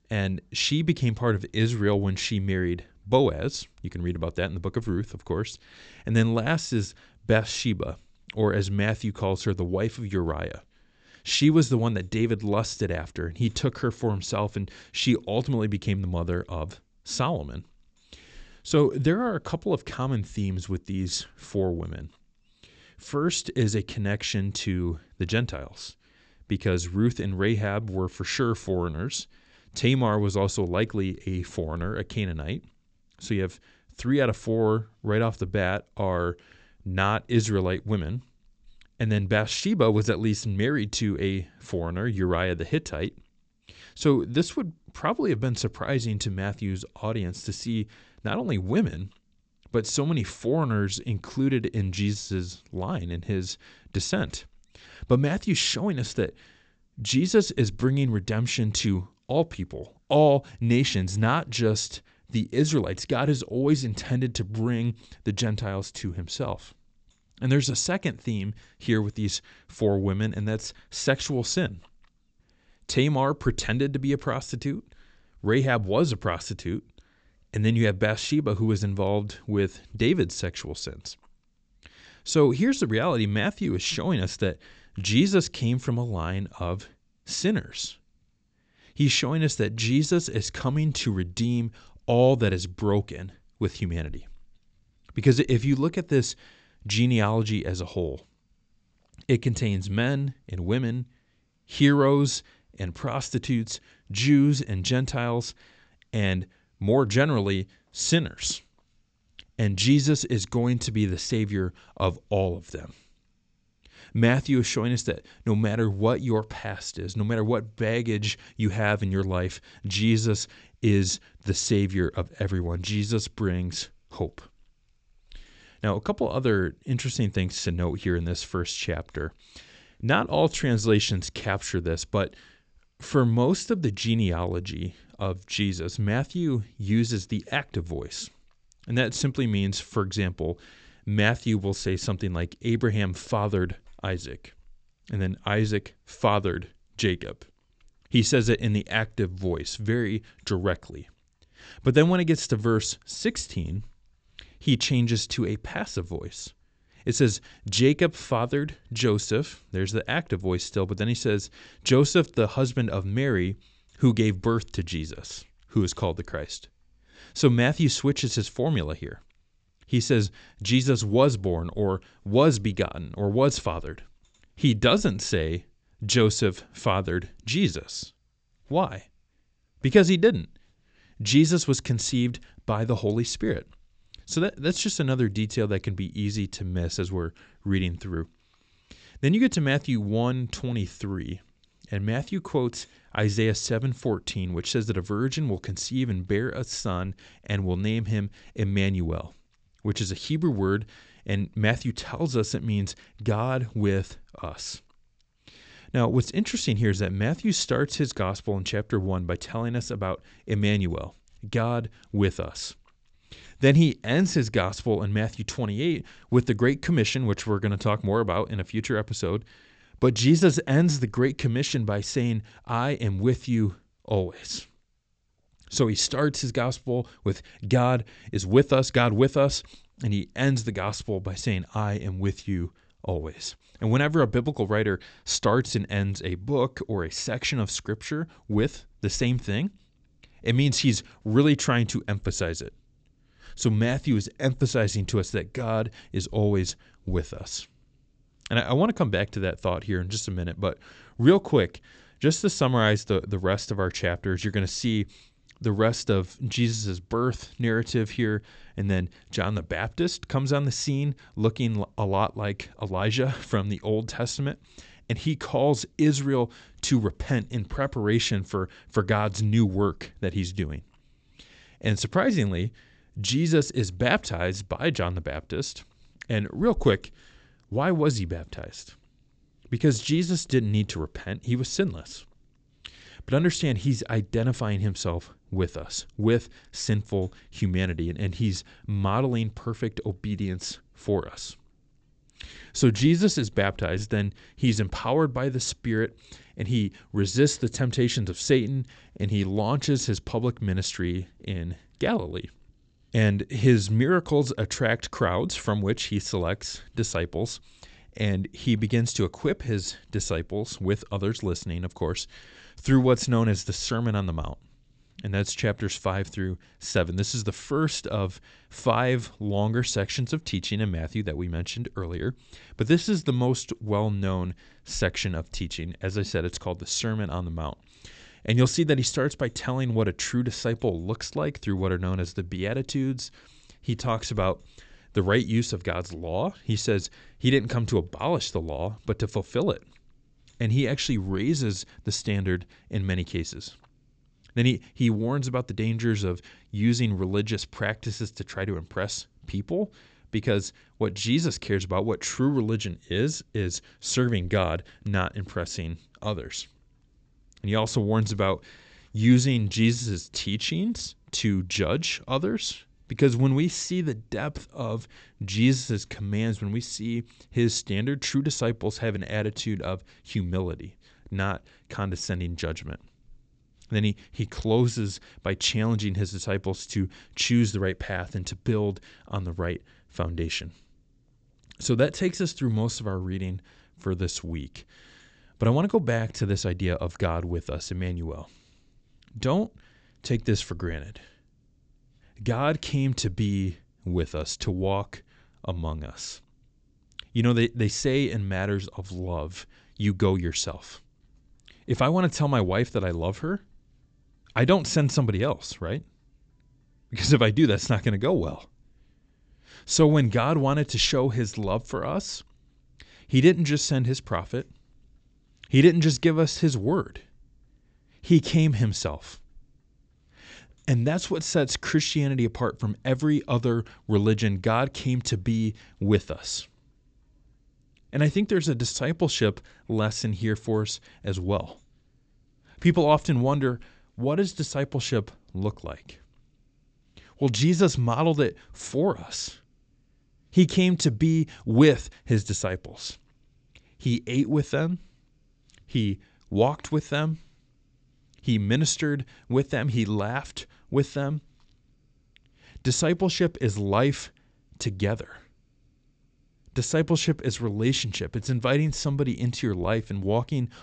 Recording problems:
high frequencies cut off; noticeable; nothing above 8 kHz

